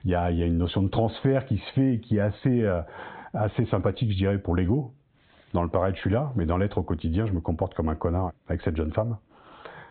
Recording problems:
high frequencies cut off; severe; nothing above 4 kHz
squashed, flat; somewhat

